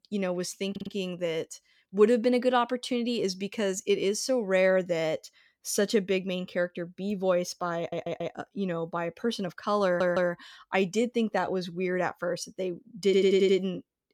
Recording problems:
audio stuttering; 4 times, first at 0.5 s

